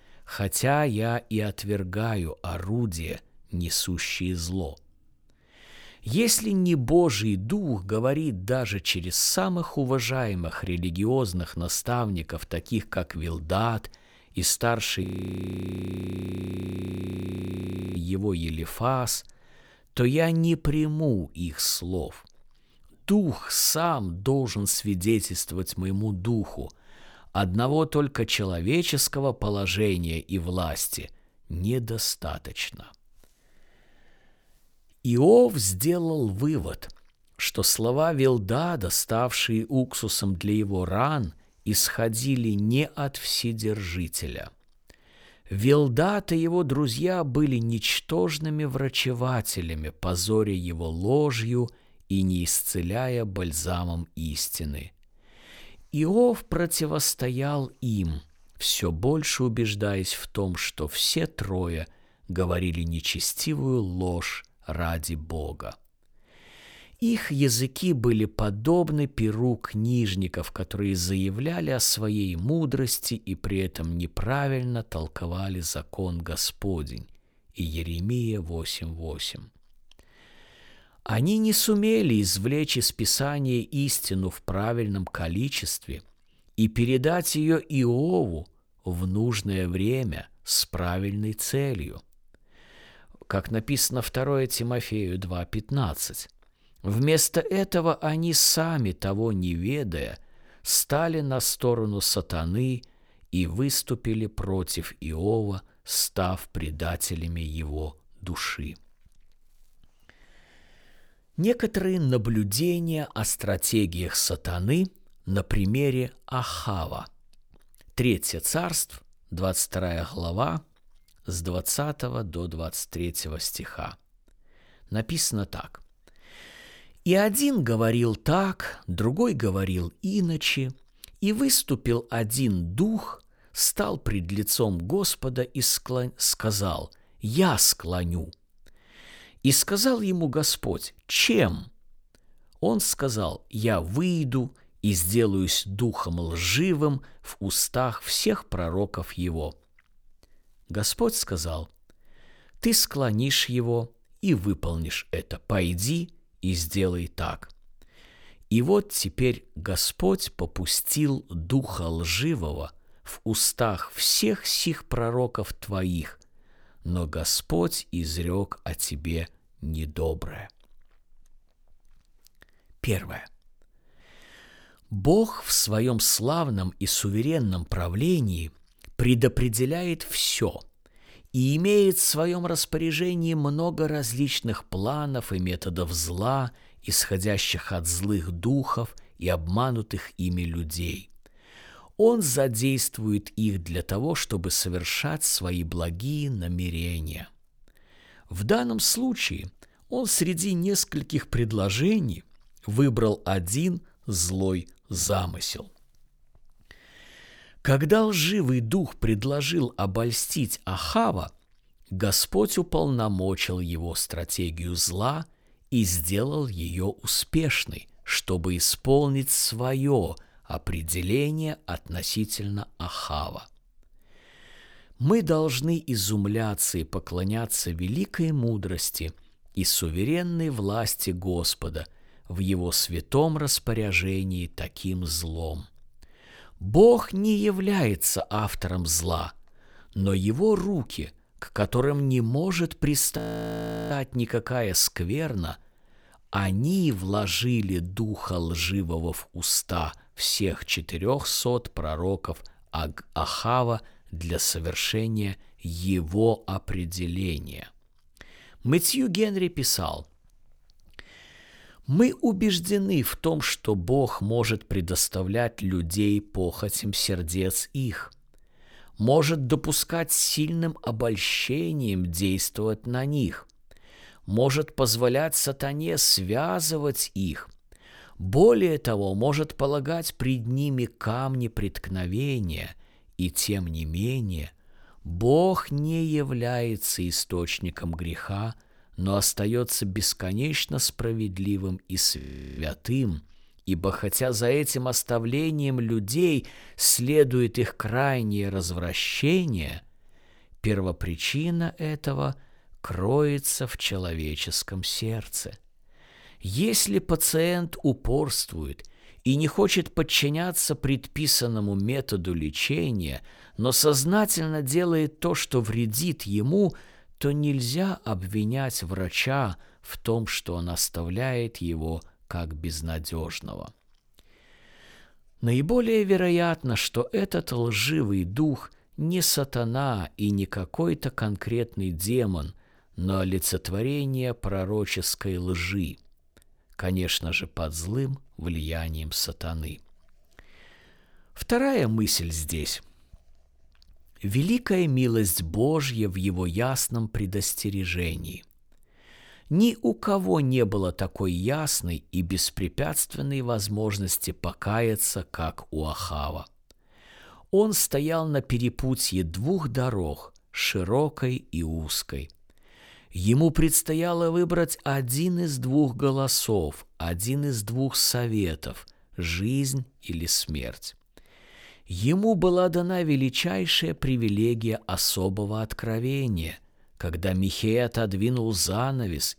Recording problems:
audio freezing; at 15 s for 3 s, at 4:03 for 0.5 s and at 4:52

